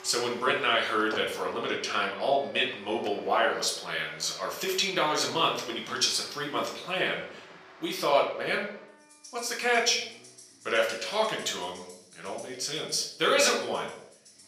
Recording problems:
off-mic speech; far
thin; somewhat; fading below 450 Hz
room echo; slight; dies away in 0.5 s
background music; faint; throughout; 25 dB below the speech
traffic noise; faint; throughout; 20 dB below the speech

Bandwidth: 14.5 kHz